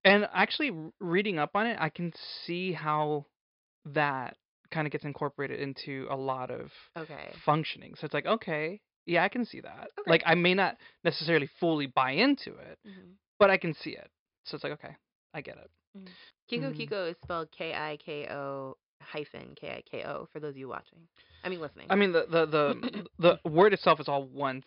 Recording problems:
high frequencies cut off; noticeable; nothing above 5.5 kHz

